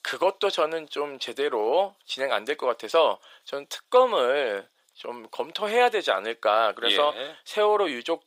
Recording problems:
thin; very; fading below 500 Hz

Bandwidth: 15.5 kHz